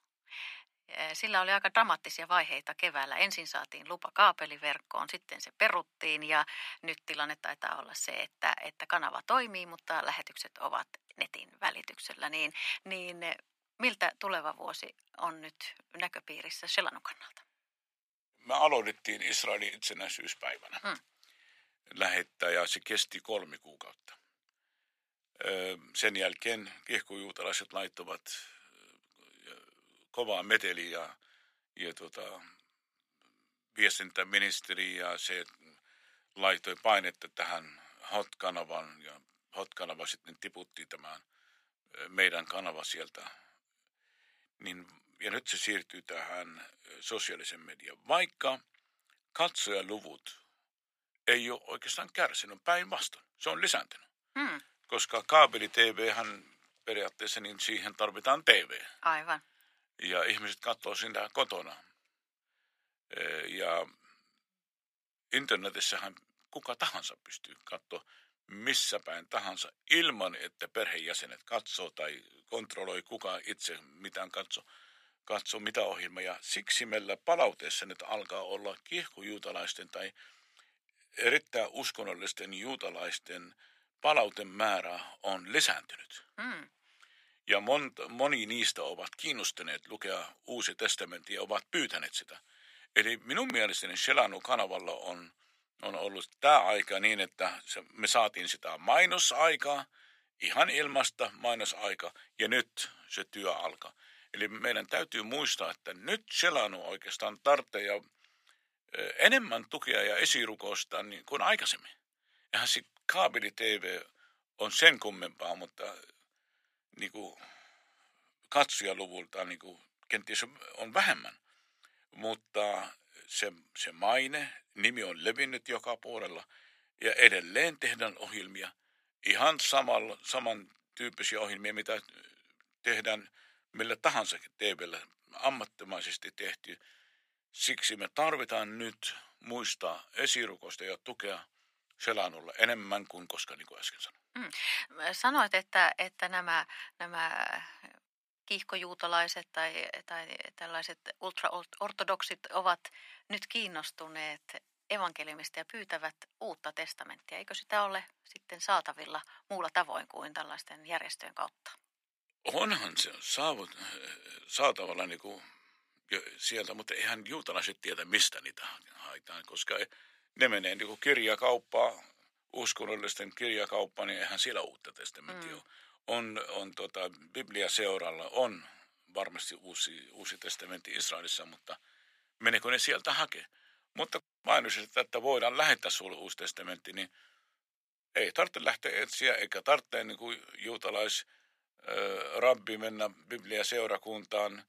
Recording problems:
thin; very; fading below 650 Hz

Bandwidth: 15 kHz